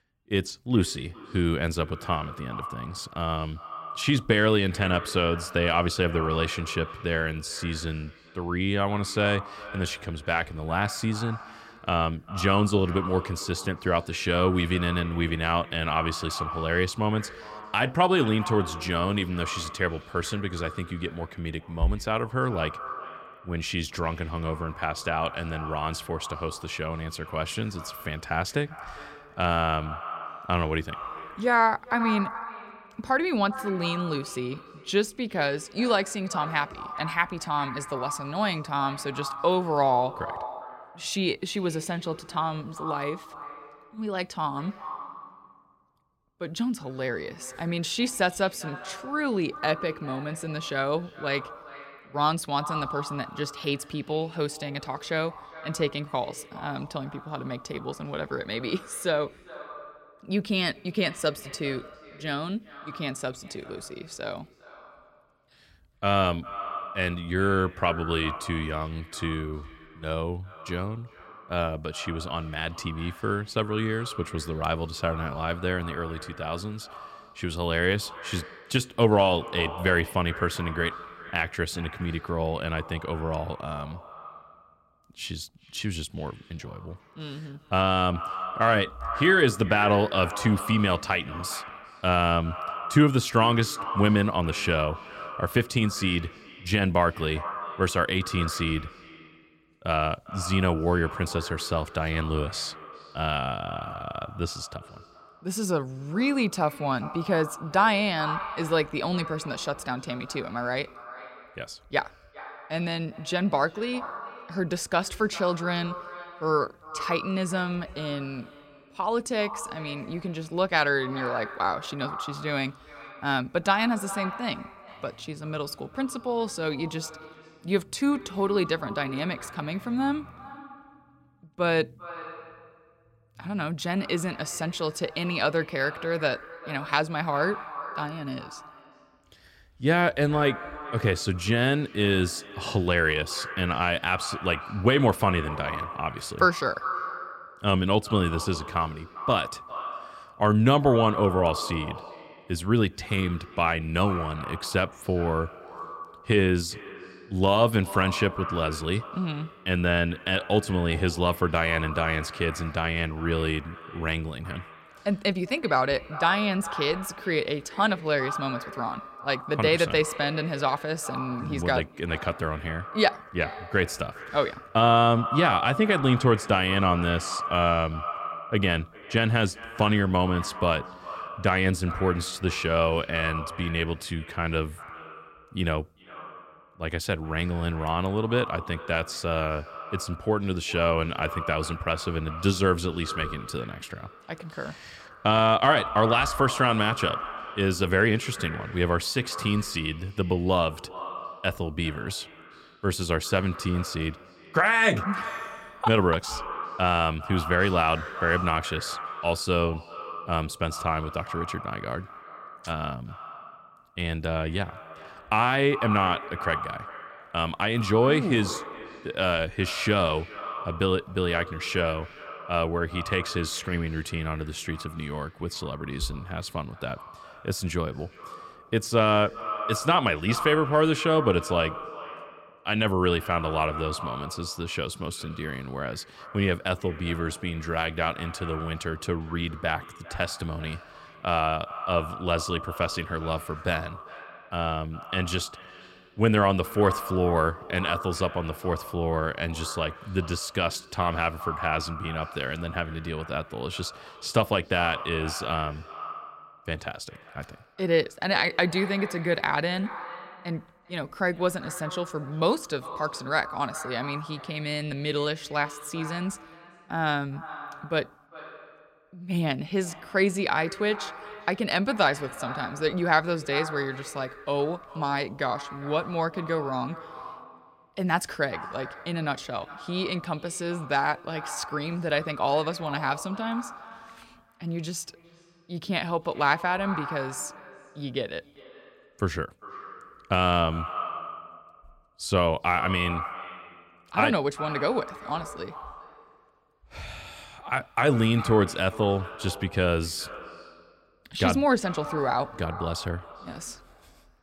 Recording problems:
echo of what is said; strong; throughout; 400 ms later, 10 dB below the speech

